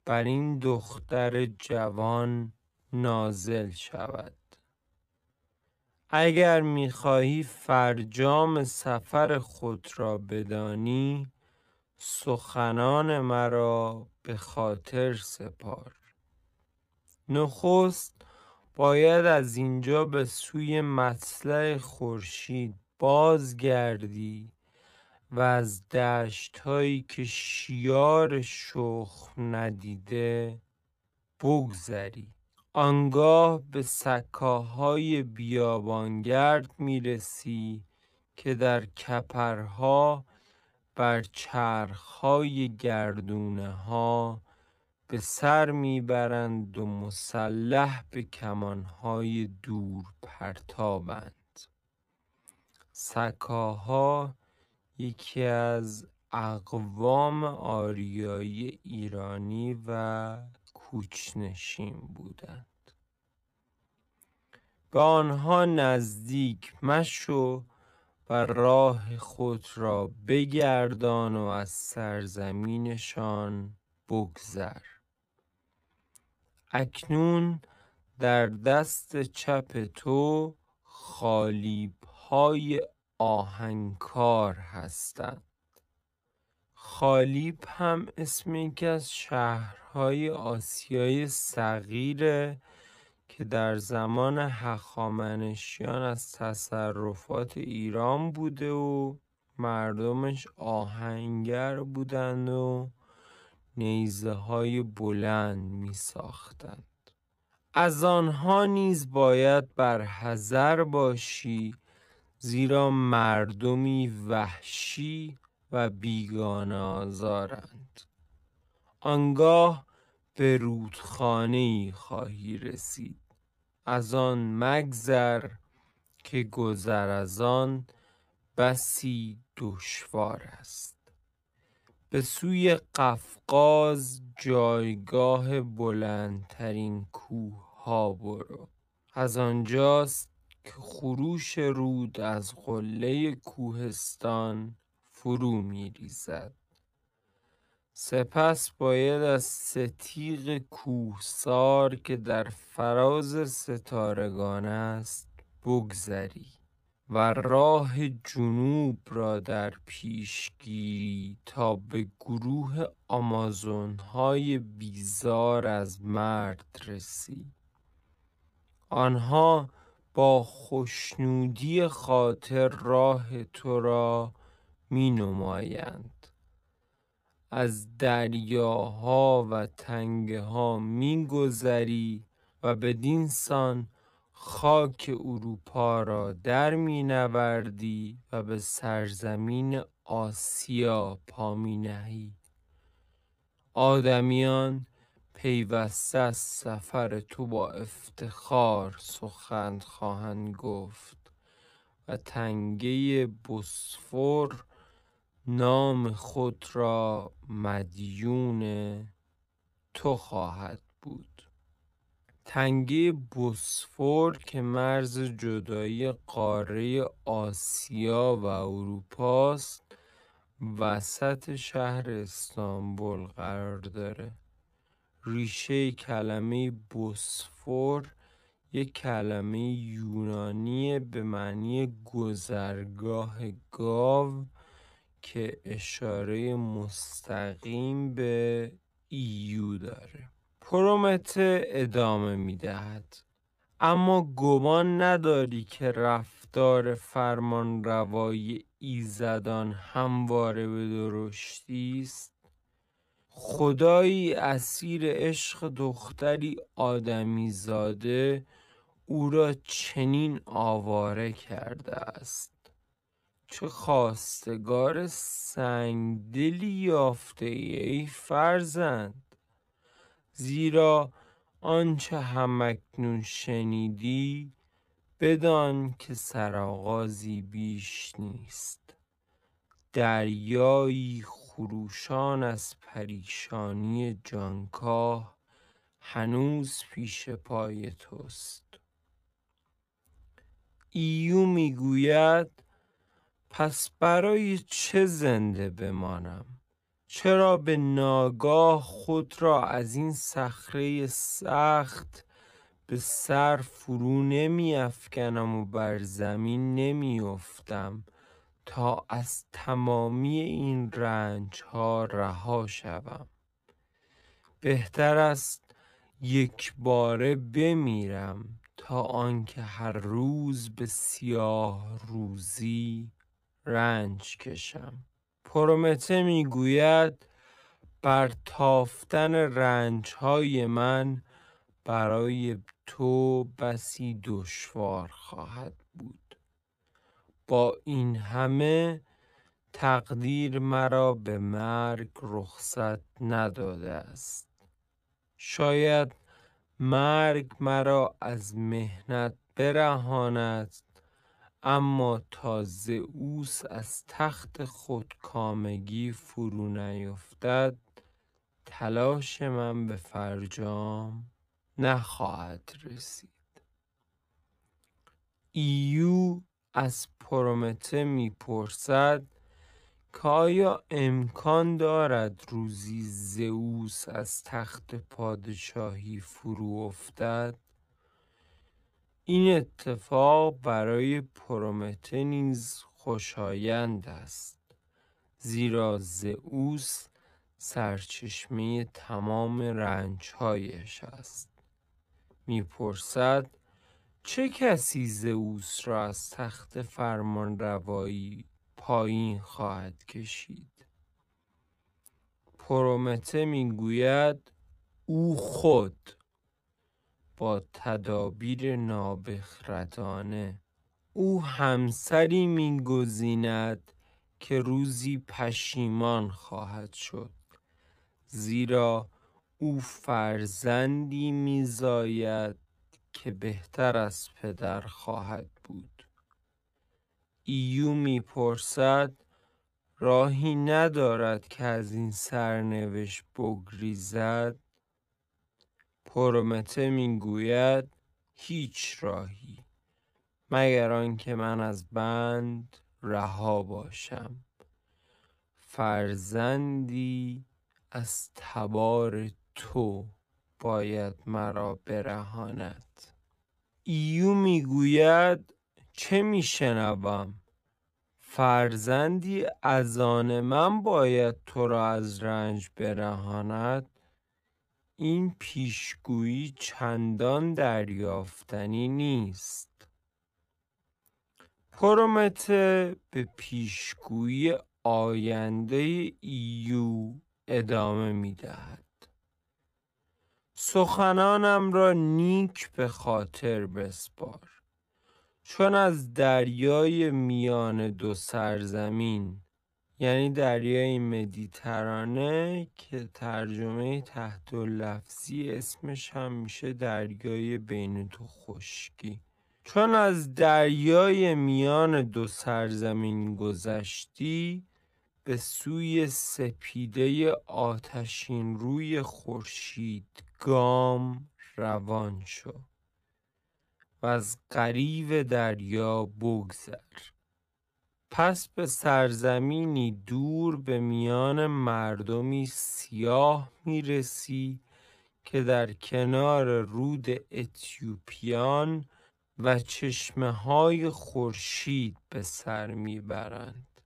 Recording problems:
wrong speed, natural pitch; too slow; 0.5 times normal speed

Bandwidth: 15 kHz